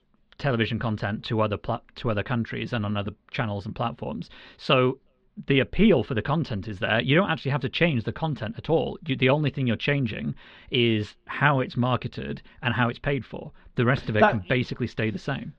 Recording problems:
muffled; slightly; fading above 3.5 kHz

